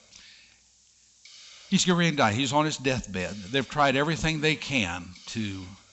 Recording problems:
high frequencies cut off; noticeable; nothing above 8 kHz
hiss; faint; throughout; 25 dB below the speech

